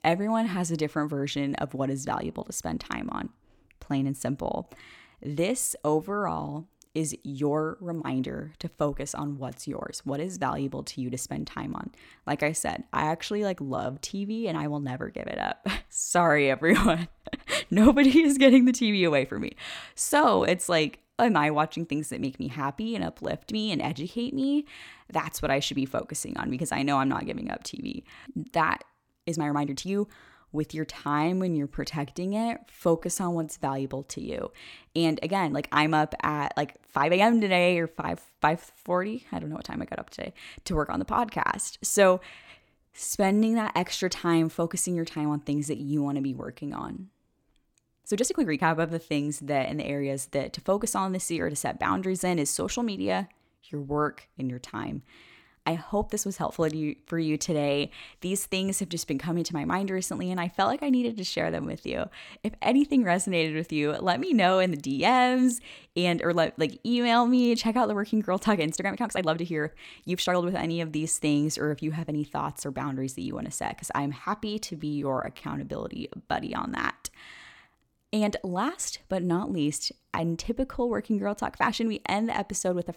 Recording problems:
uneven, jittery; strongly; from 4.5 s to 1:22

